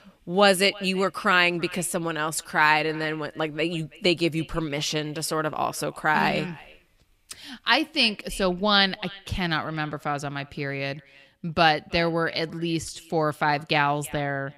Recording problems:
echo of what is said; faint; throughout; 330 ms later, 20 dB below the speech

